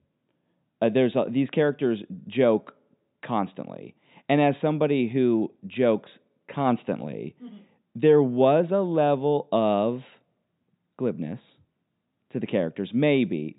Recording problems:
high frequencies cut off; severe; nothing above 4 kHz

